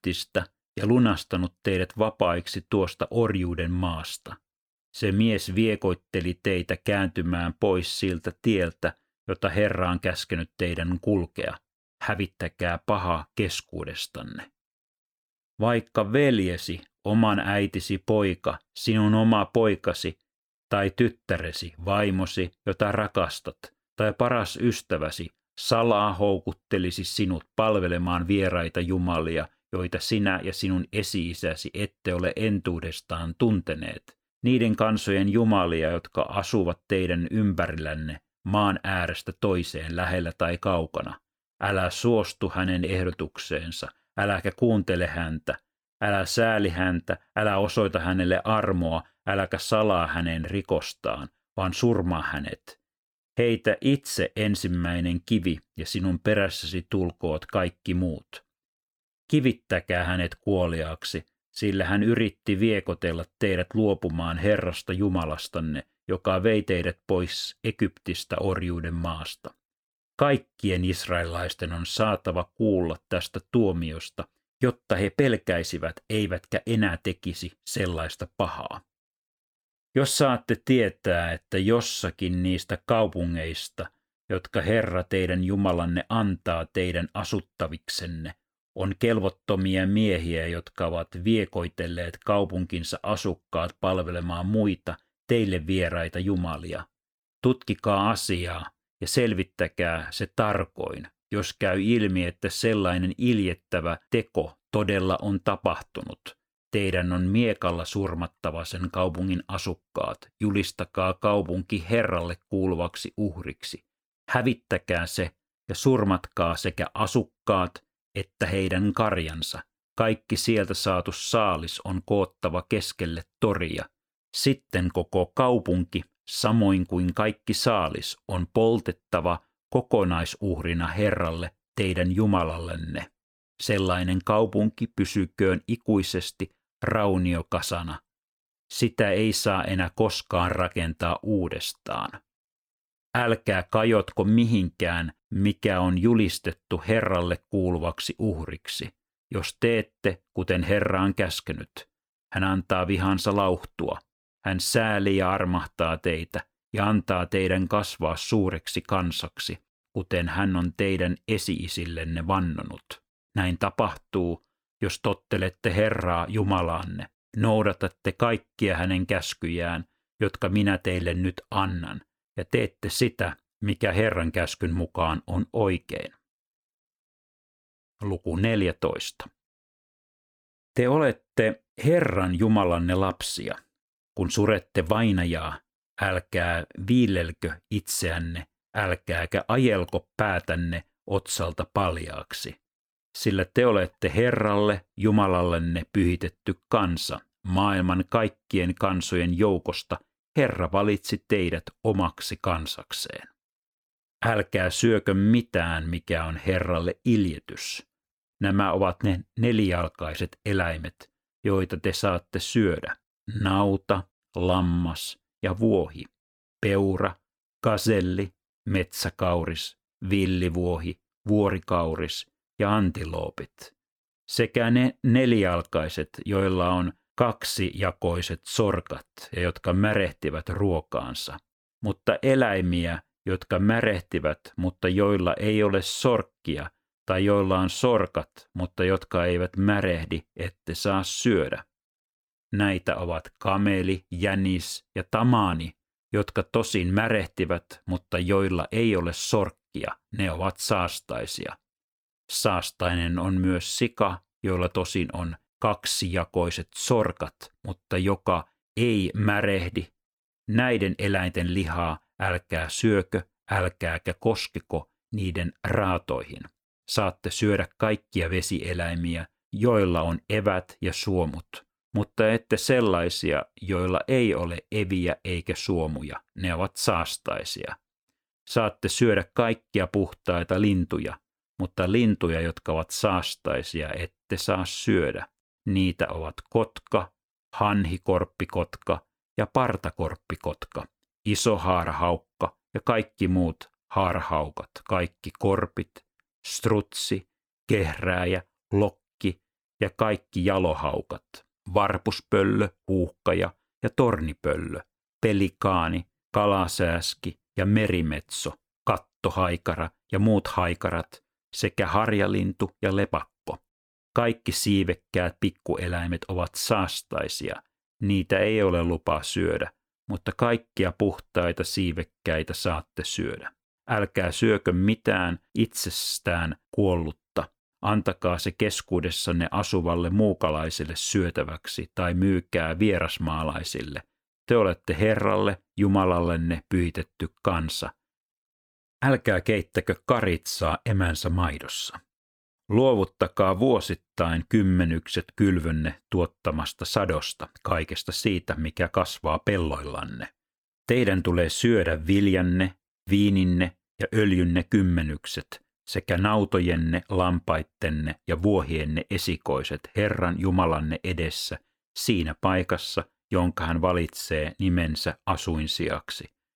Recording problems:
none

